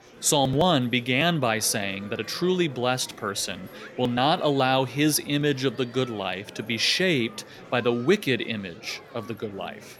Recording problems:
murmuring crowd; noticeable; throughout; 20 dB below the speech

